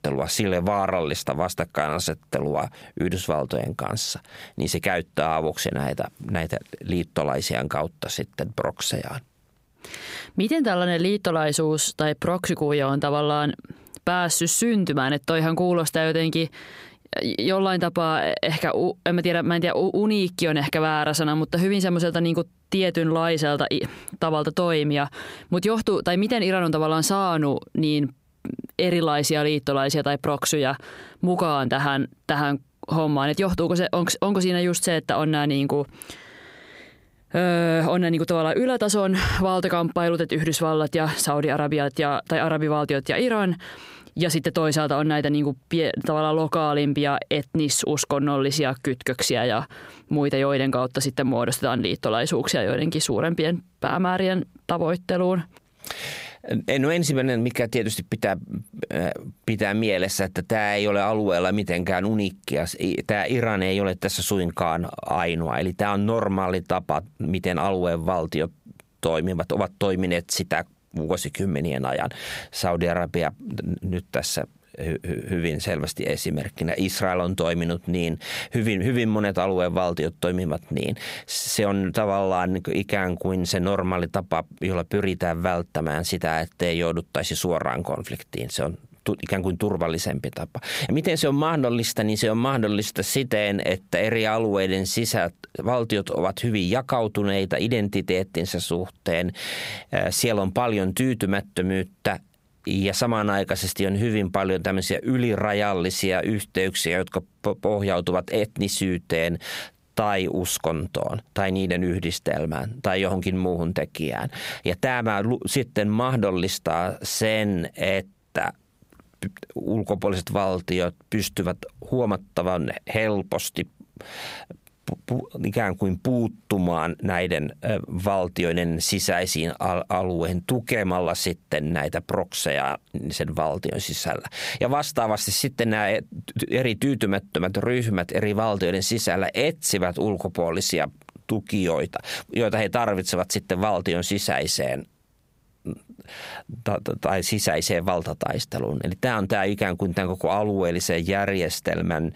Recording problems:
squashed, flat; heavily

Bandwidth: 15.5 kHz